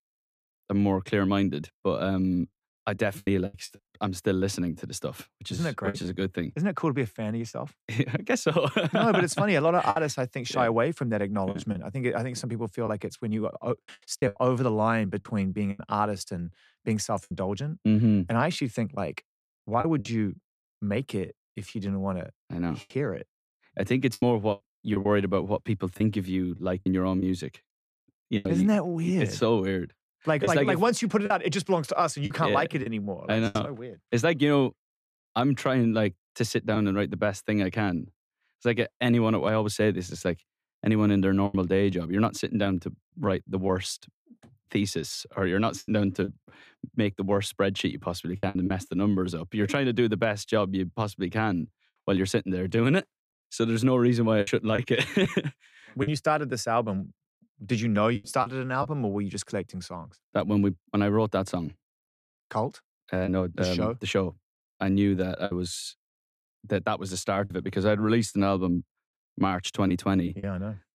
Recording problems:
choppy; occasionally; 4% of the speech affected

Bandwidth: 14.5 kHz